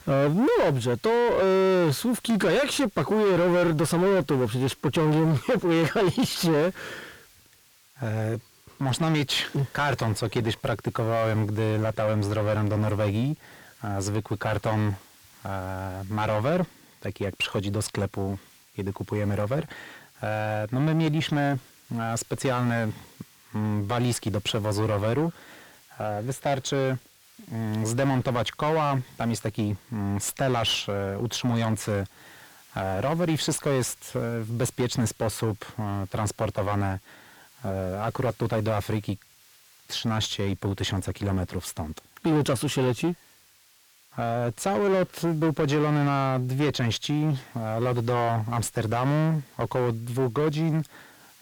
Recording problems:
distortion; heavy; 7 dB below the speech
hiss; faint; throughout; 25 dB below the speech

